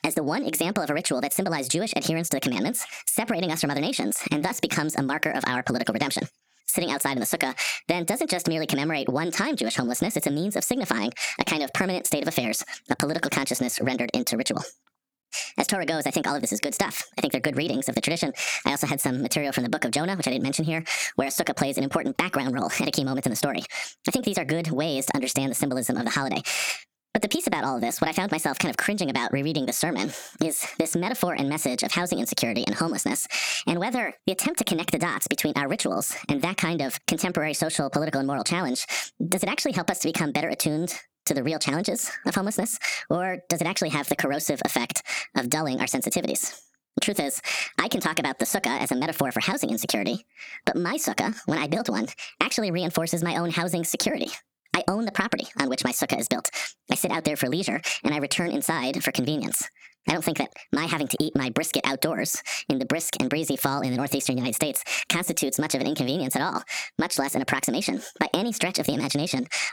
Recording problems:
squashed, flat; heavily
wrong speed and pitch; too fast and too high; 1.5 times normal speed

